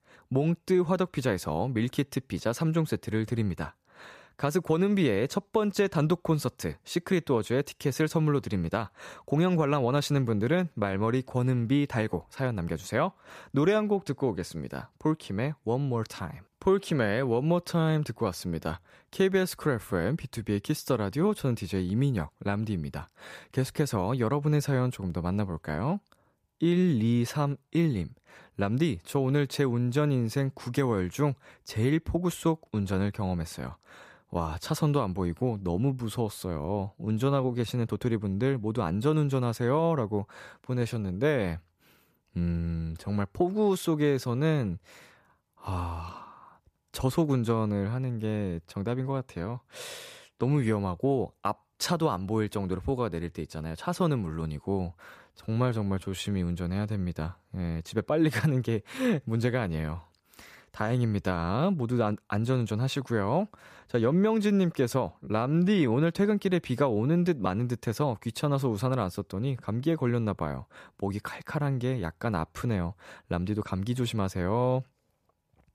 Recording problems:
uneven, jittery; strongly; from 10 s to 1:06

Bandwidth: 14.5 kHz